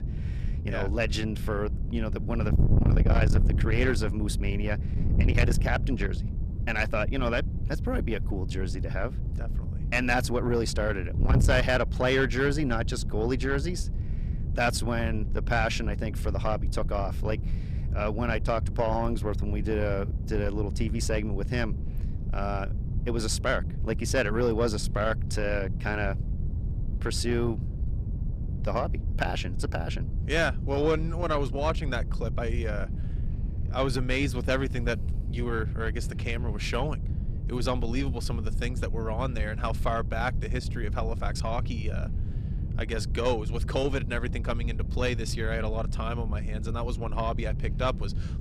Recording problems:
distortion; slight; 10 dB below the speech
wind noise on the microphone; occasional gusts; 15 dB below the speech

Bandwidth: 14.5 kHz